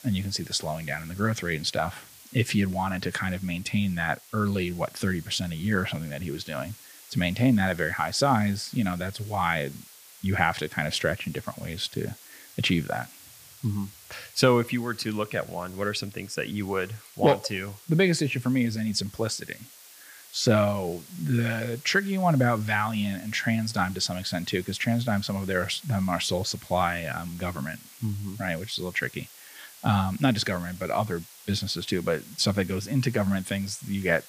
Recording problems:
hiss; noticeable; throughout; 20 dB below the speech

